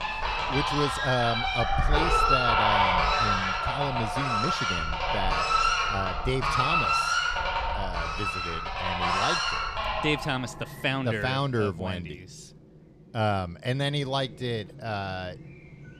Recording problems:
animal sounds; very loud; throughout; 5 dB above the speech

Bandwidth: 14.5 kHz